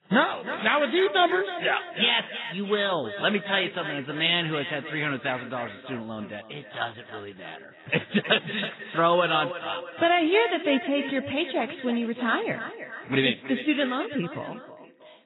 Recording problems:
echo of what is said; strong; throughout; 320 ms later, 10 dB below the speech
garbled, watery; badly; nothing above 4 kHz

